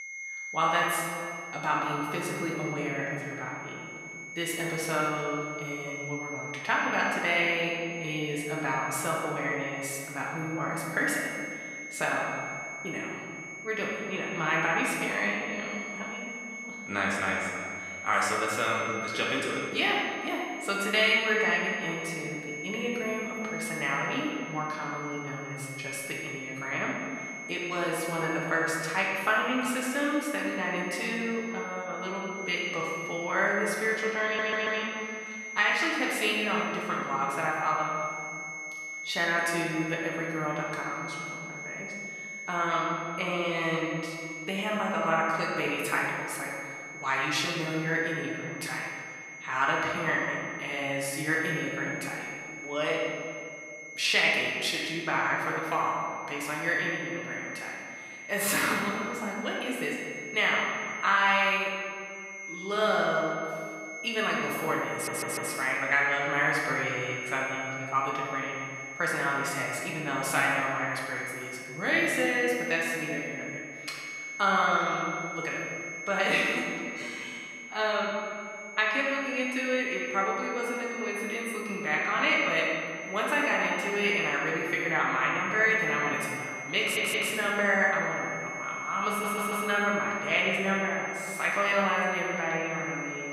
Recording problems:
off-mic speech; far
room echo; noticeable; dies away in 1.9 s
thin; somewhat; fading below 700 Hz
high-pitched whine; loud; throughout; 2 kHz, 10 dB below the speech
audio stuttering; 4 times, first at 34 s

